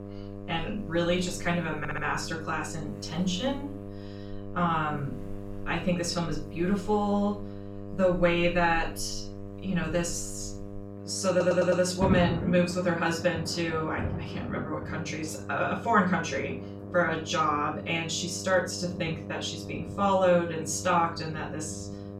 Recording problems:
off-mic speech; far
room echo; slight; dies away in 0.3 s
electrical hum; noticeable; throughout; 50 Hz, 15 dB below the speech
rain or running water; noticeable; throughout; 15 dB below the speech
audio stuttering; at 2 s and at 11 s

